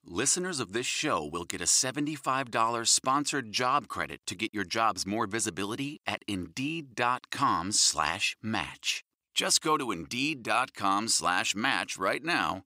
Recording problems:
thin; very slightly; fading below 350 Hz

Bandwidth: 15.5 kHz